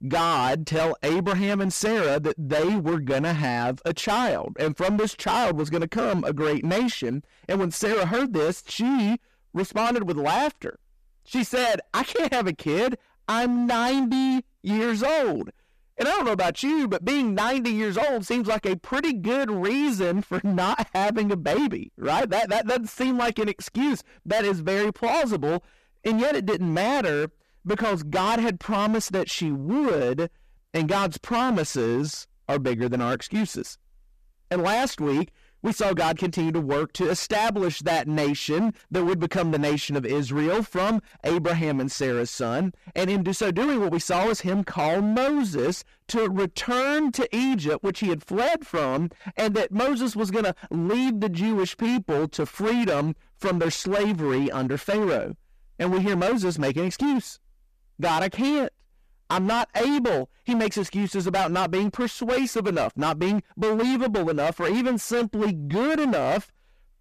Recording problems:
distortion; heavy; 24% of the sound clipped

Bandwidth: 14.5 kHz